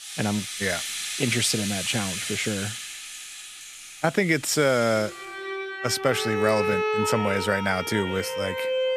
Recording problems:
background music; loud; throughout; 4 dB below the speech

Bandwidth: 14.5 kHz